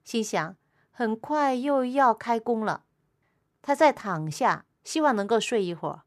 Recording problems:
none

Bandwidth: 14.5 kHz